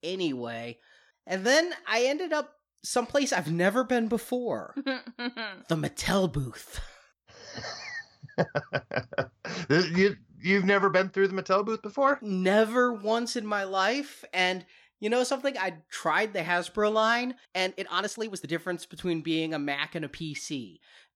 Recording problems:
uneven, jittery; strongly; from 1 to 18 s

